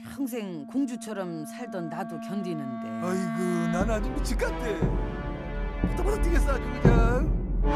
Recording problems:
background music; very loud; throughout; 3 dB above the speech

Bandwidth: 14.5 kHz